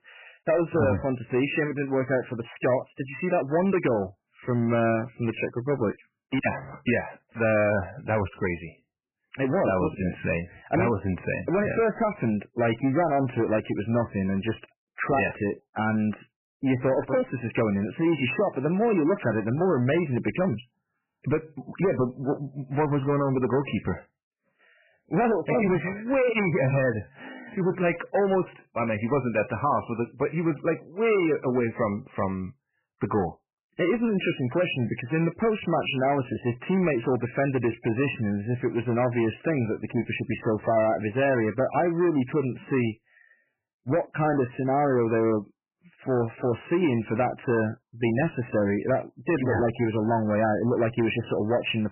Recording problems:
garbled, watery; badly; nothing above 3 kHz
distortion; slight; 10 dB below the speech

